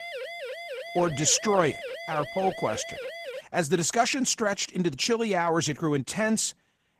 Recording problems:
garbled, watery; slightly; nothing above 14.5 kHz
siren; noticeable; until 3.5 s; peak 9 dB below the speech

